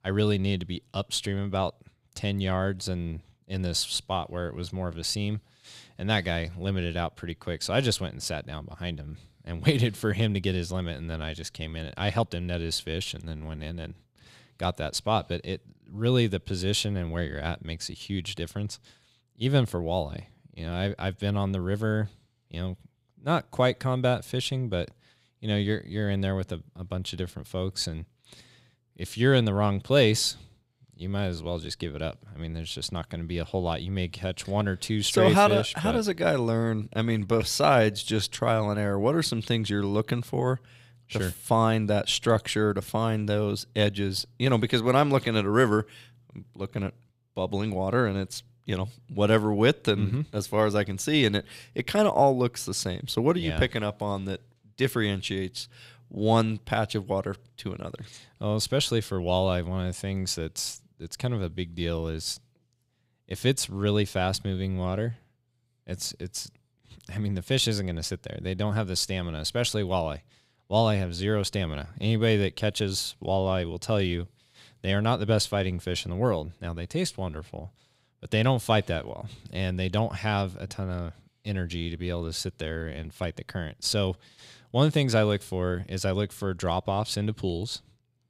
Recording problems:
none

